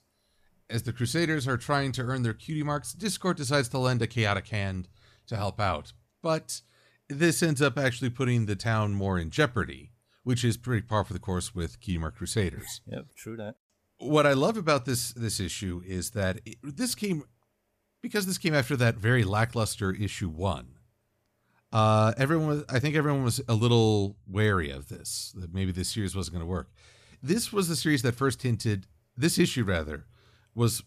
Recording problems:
none

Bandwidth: 14.5 kHz